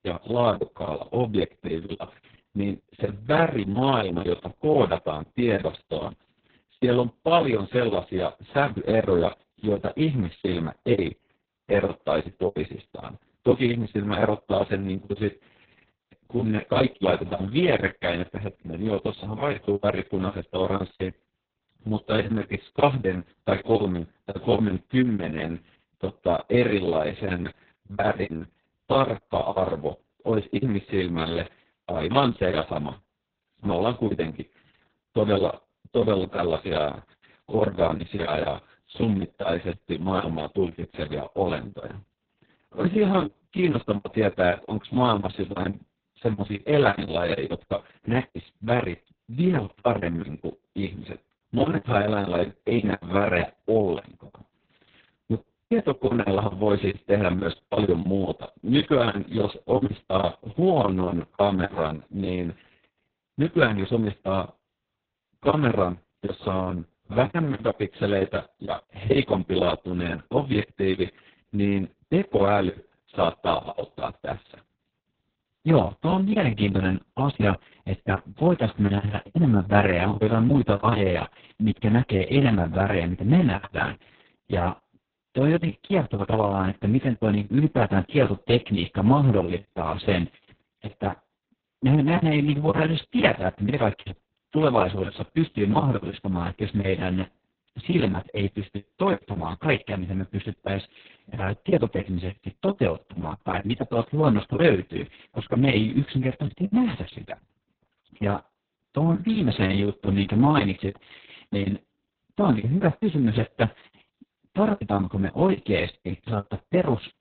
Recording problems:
garbled, watery; badly; nothing above 4 kHz
choppy; very; 11% of the speech affected

